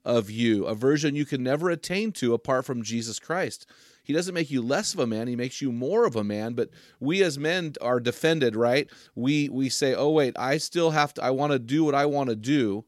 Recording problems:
none

